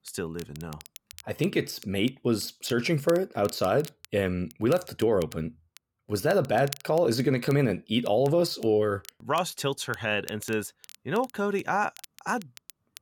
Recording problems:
crackle, like an old record; faint; 20 dB below the speech

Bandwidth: 17.5 kHz